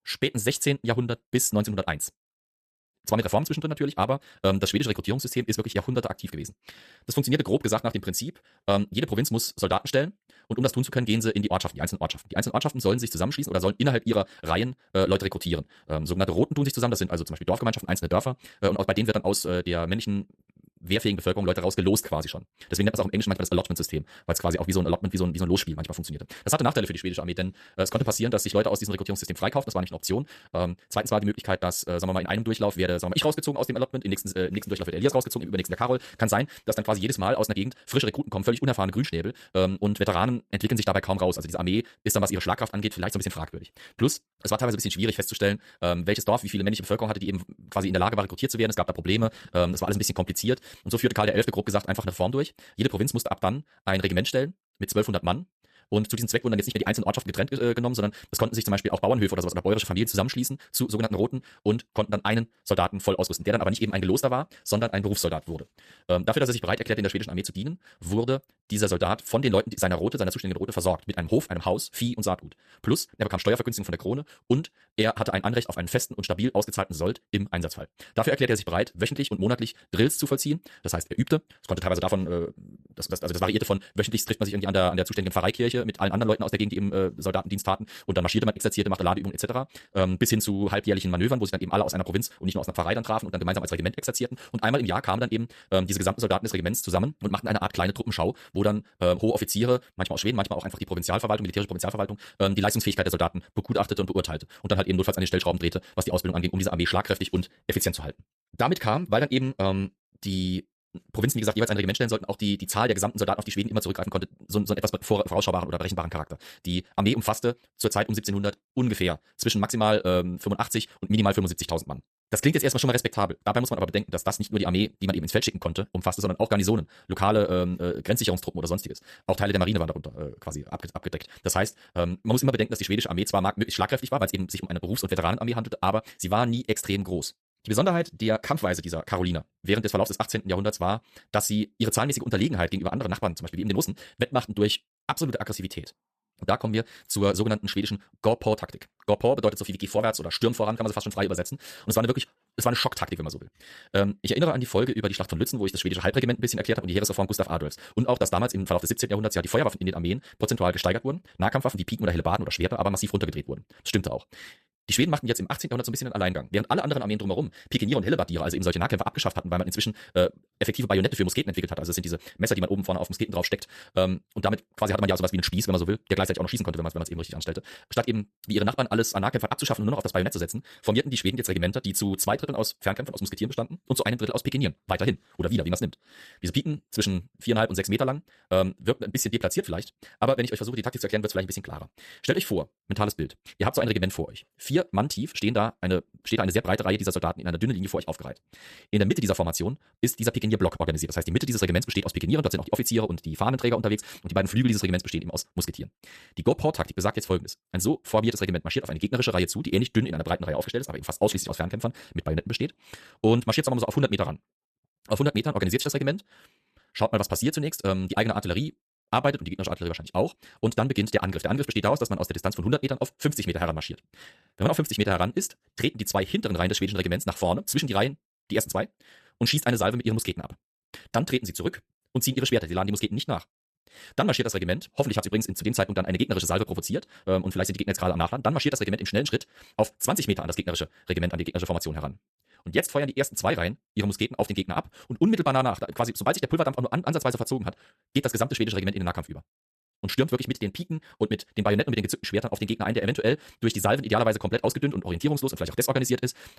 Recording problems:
wrong speed, natural pitch; too fast; 1.8 times normal speed

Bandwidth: 14.5 kHz